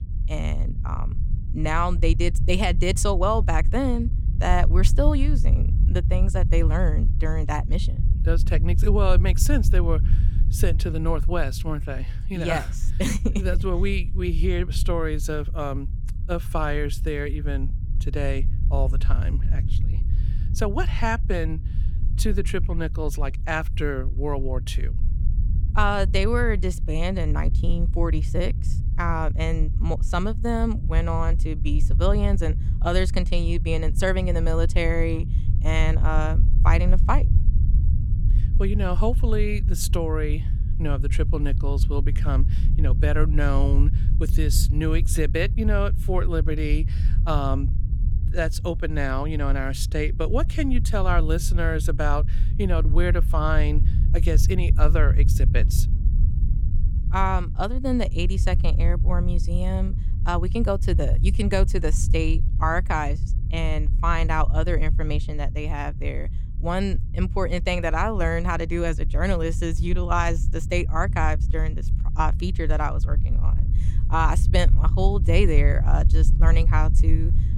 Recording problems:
low rumble; noticeable; throughout; 15 dB below the speech

